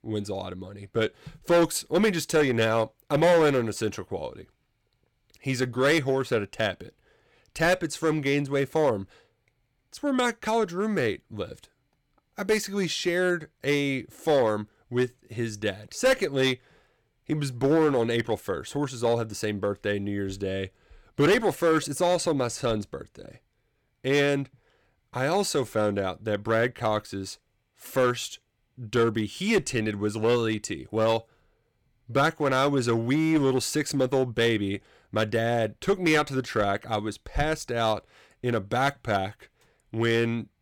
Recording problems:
distortion; slight; 4% of the sound clipped

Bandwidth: 17 kHz